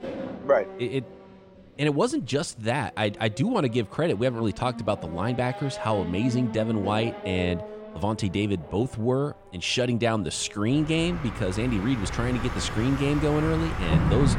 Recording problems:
traffic noise; loud; throughout; 8 dB below the speech

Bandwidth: 17.5 kHz